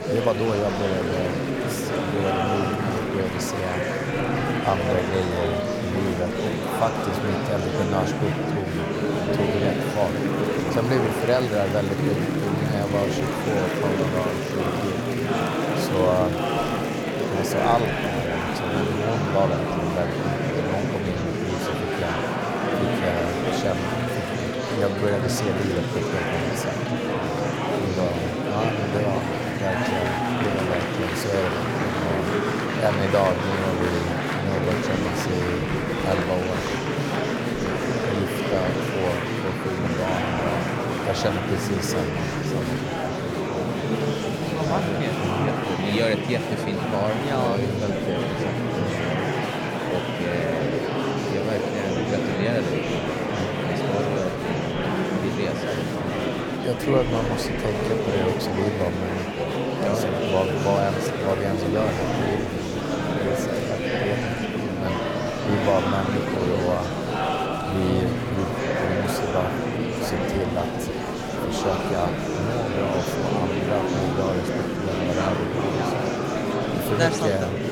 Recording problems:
murmuring crowd; very loud; throughout; 3 dB above the speech

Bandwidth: 17 kHz